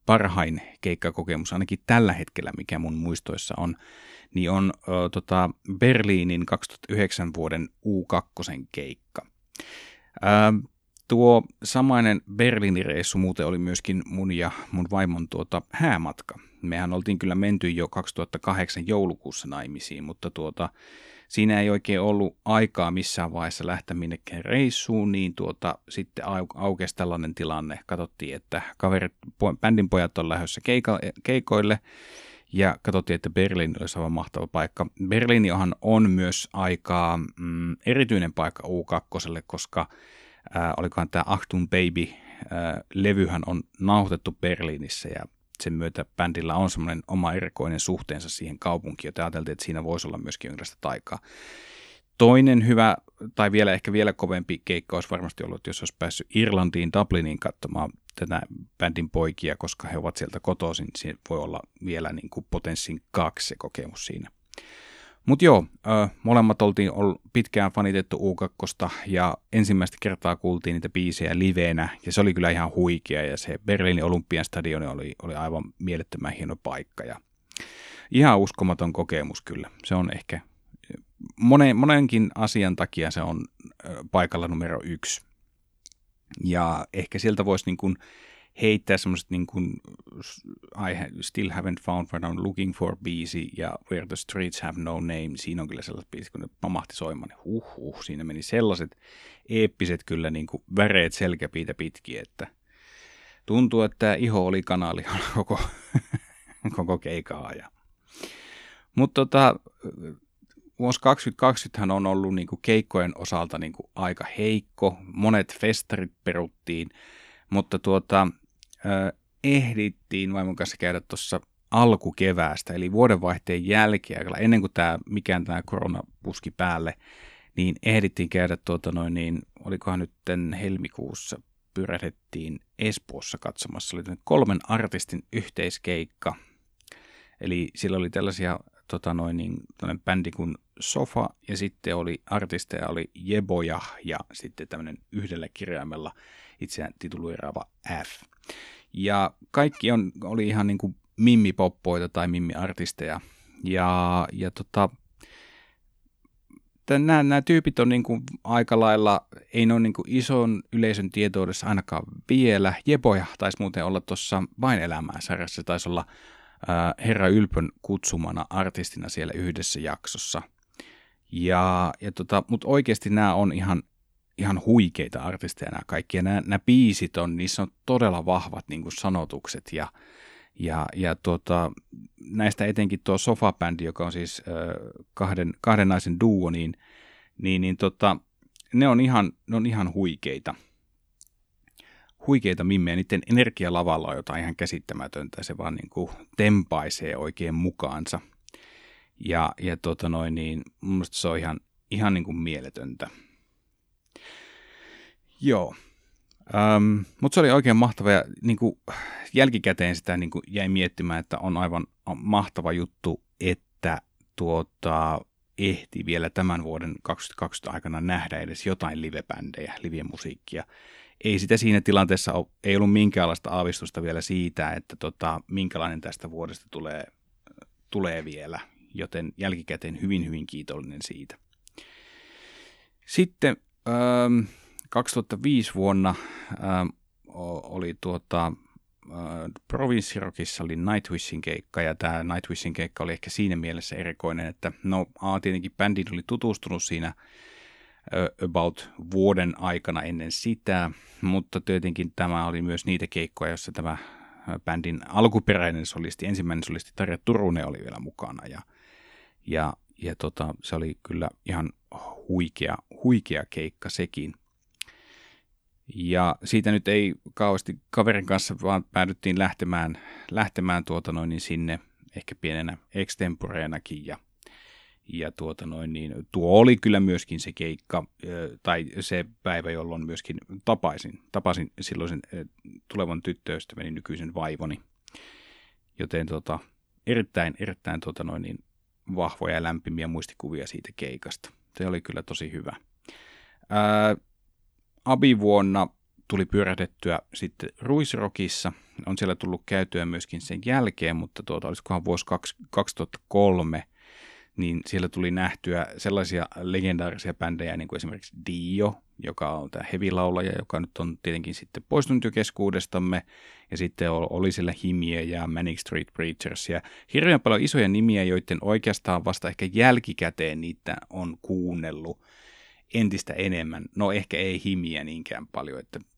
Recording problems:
none

